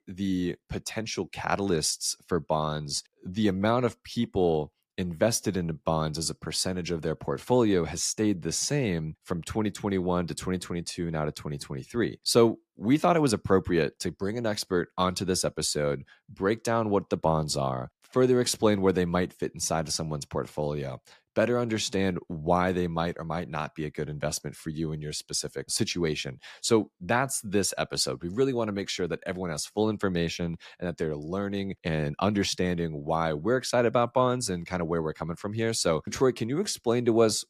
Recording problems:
none

